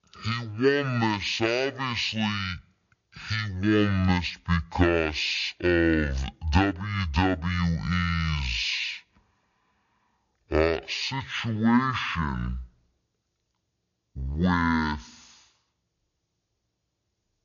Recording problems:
wrong speed and pitch; too slow and too low; 0.5 times normal speed

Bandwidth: 7 kHz